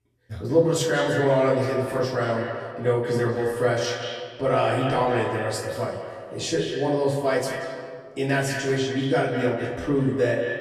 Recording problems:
echo of what is said; strong; throughout; 180 ms later, 6 dB below the speech
off-mic speech; far
room echo; slight; dies away in 0.4 s

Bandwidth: 14 kHz